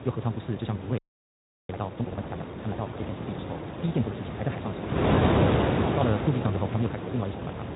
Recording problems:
high frequencies cut off; severe; nothing above 4 kHz
wrong speed, natural pitch; too fast; 1.8 times normal speed
garbled, watery; slightly
wind noise on the microphone; heavy; 5 dB above the speech
audio freezing; at 1 s for 0.5 s

